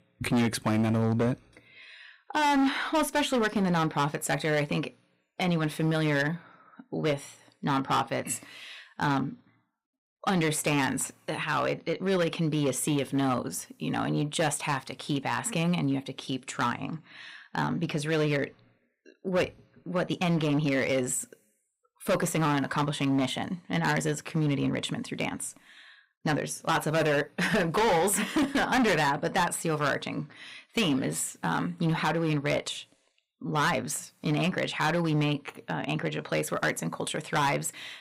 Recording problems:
distortion; heavy; 9% of the sound clipped

